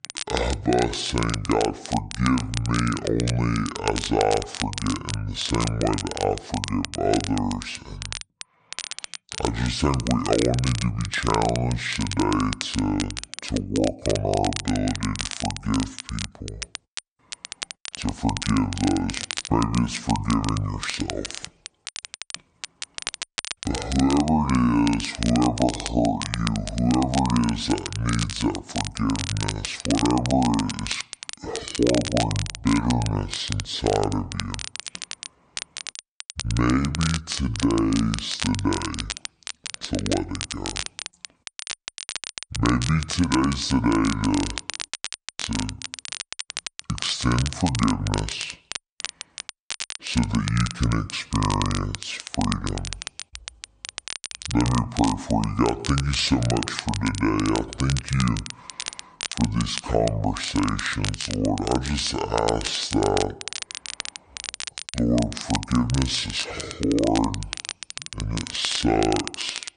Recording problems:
wrong speed and pitch; too slow and too low; 0.6 times normal speed
crackle, like an old record; loud; 8 dB below the speech

